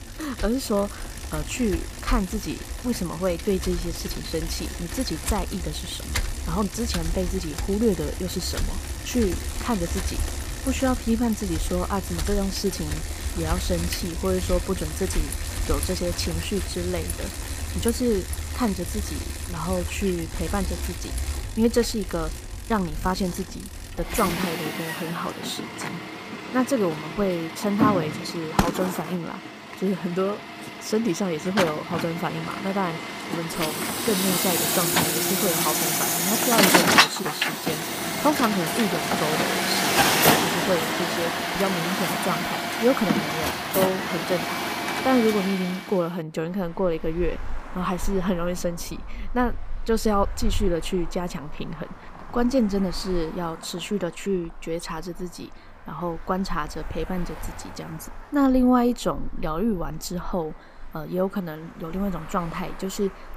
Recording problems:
traffic noise; very loud; throughout; as loud as the speech

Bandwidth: 15 kHz